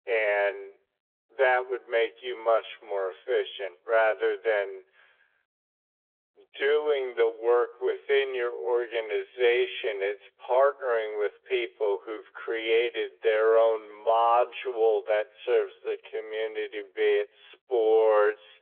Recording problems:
wrong speed, natural pitch; too slow; 0.6 times normal speed
phone-call audio; nothing above 3.5 kHz

